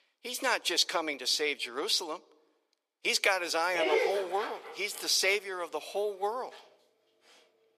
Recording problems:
thin; very; fading below 450 Hz
dog barking; loud; at 4 s; peak 2 dB above the speech

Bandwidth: 14.5 kHz